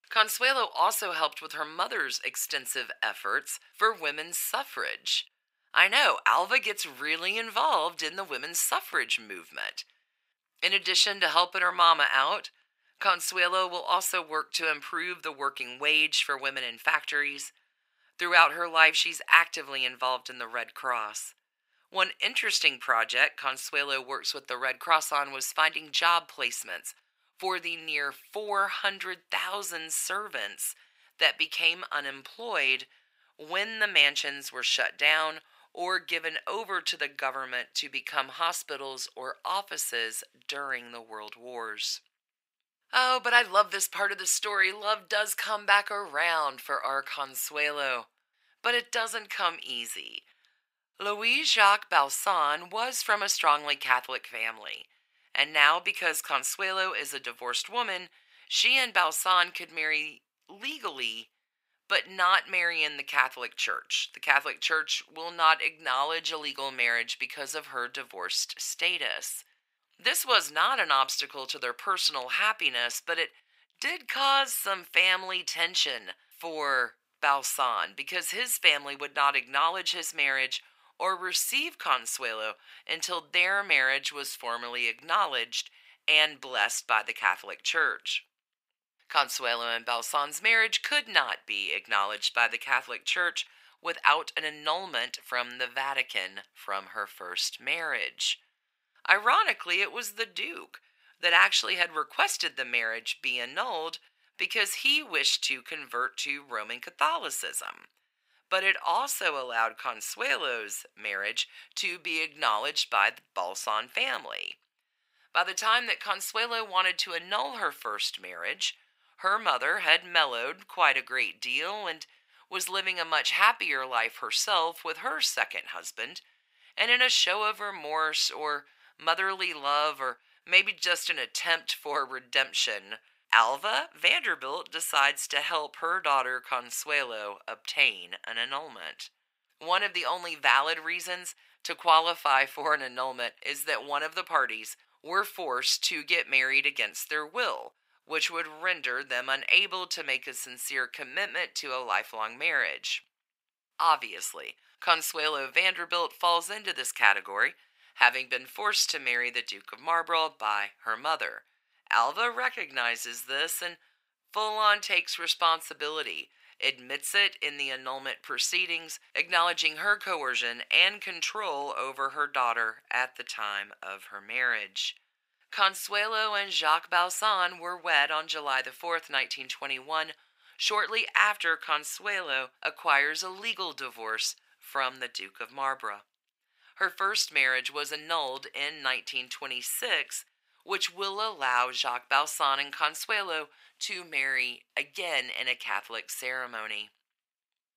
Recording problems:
thin; very; fading below 800 Hz

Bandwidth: 15.5 kHz